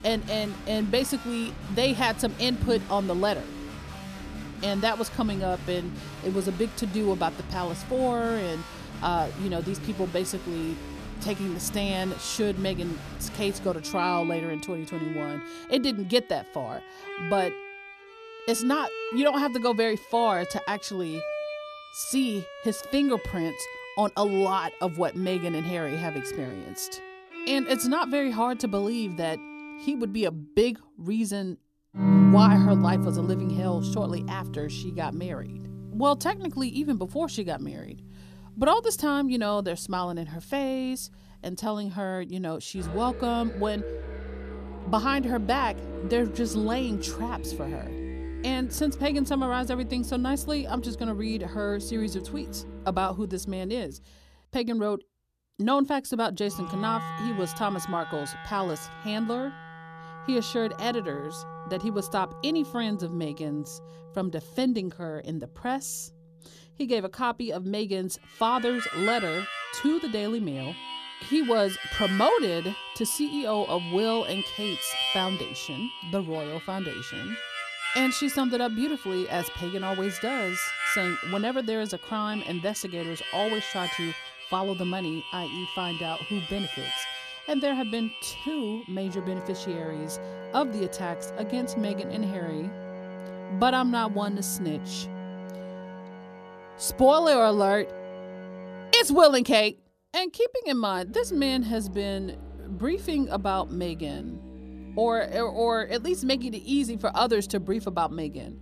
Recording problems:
background music; loud; throughout; 6 dB below the speech

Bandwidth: 14.5 kHz